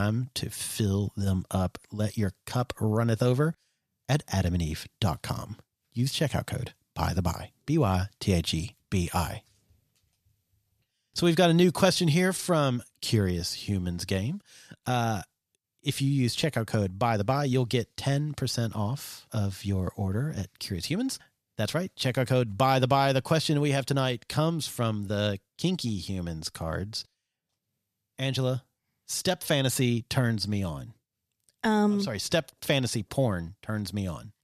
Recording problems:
abrupt cut into speech; at the start

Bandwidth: 14.5 kHz